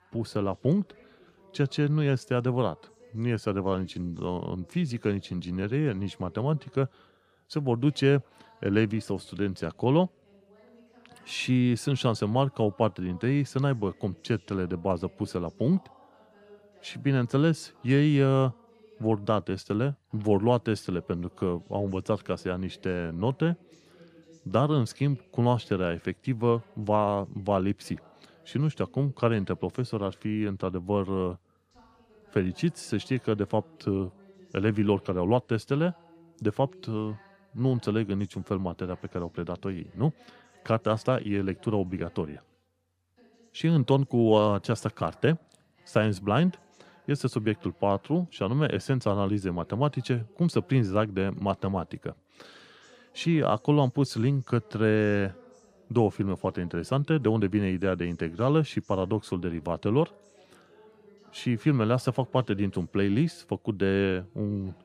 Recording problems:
voice in the background; faint; throughout; 30 dB below the speech

